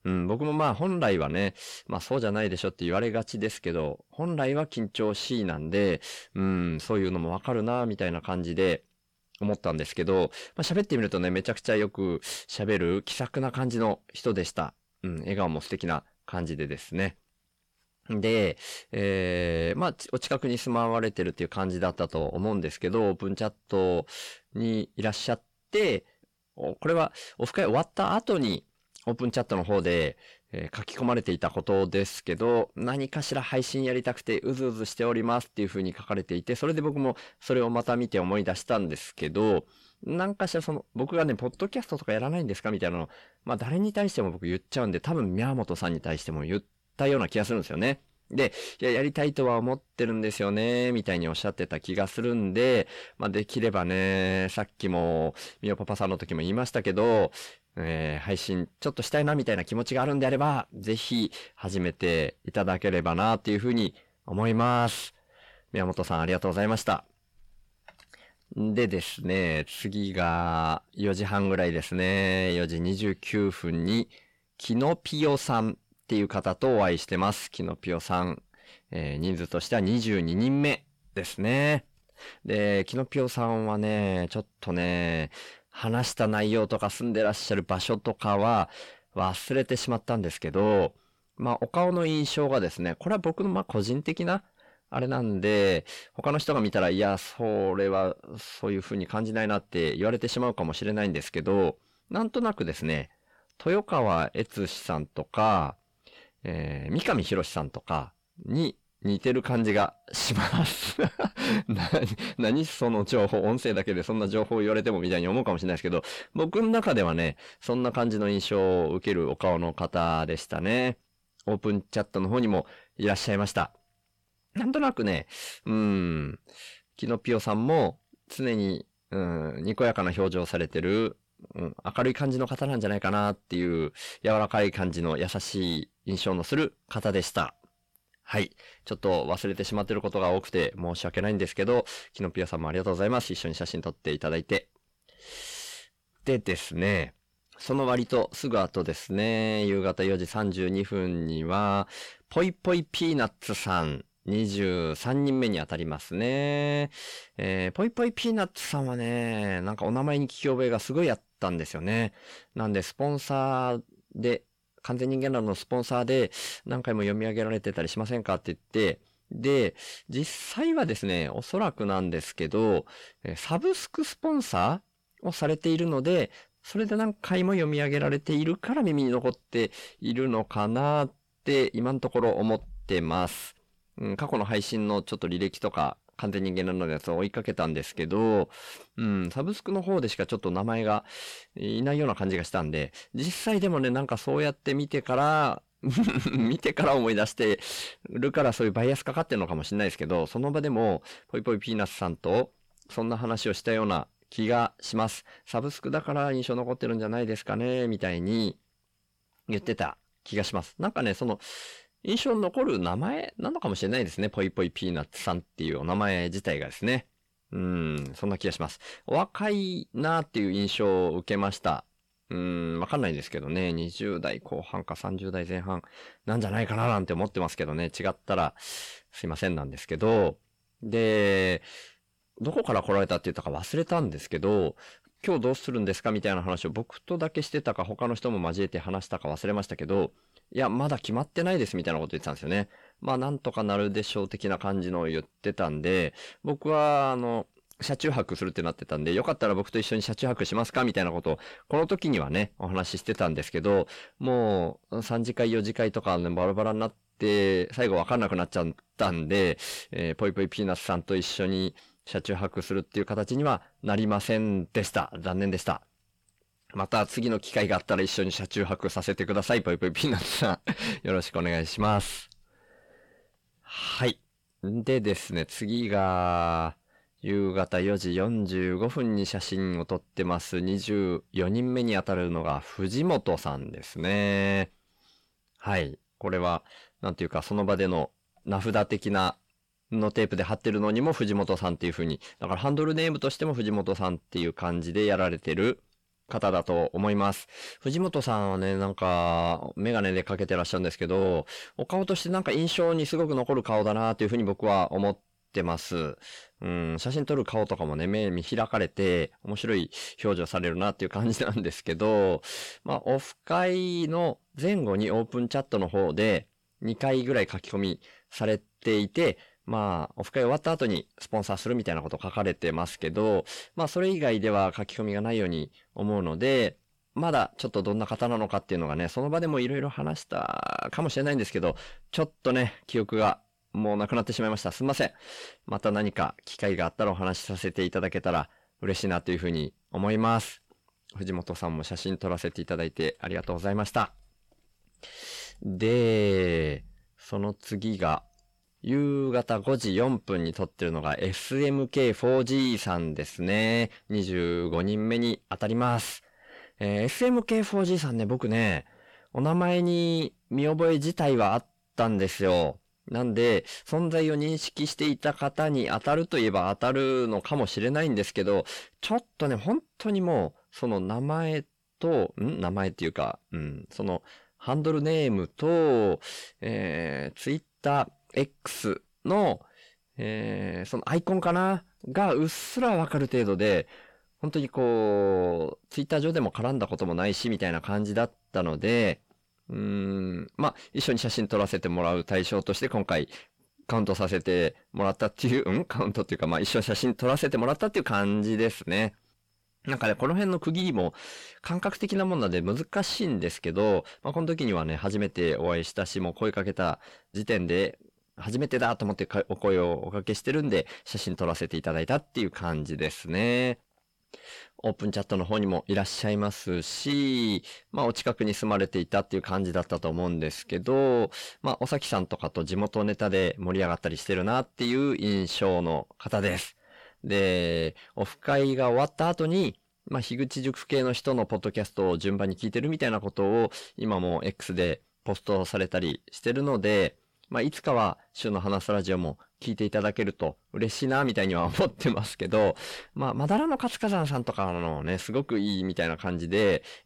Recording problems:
distortion; slight; 10 dB below the speech

